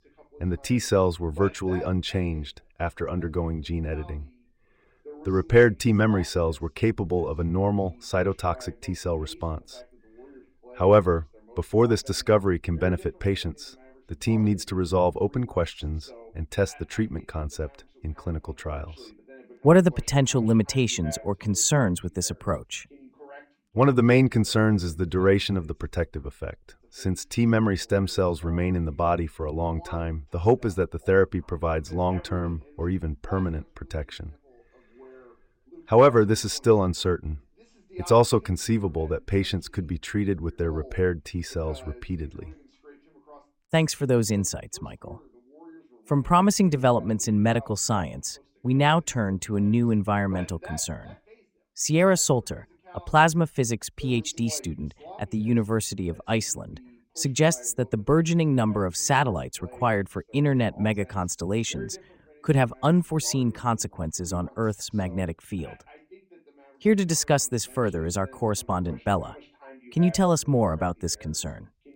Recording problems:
voice in the background; faint; throughout; 25 dB below the speech

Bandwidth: 16 kHz